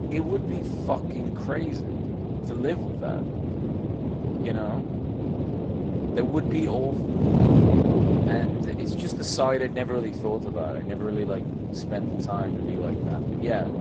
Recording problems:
garbled, watery; slightly; nothing above 7.5 kHz
wind noise on the microphone; heavy; 1 dB below the speech

